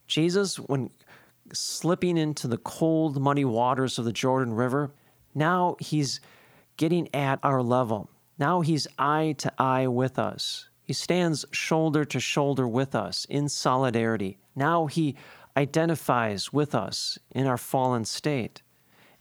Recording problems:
none

